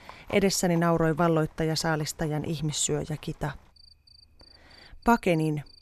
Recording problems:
animal sounds; faint; throughout; 25 dB below the speech

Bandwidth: 13.5 kHz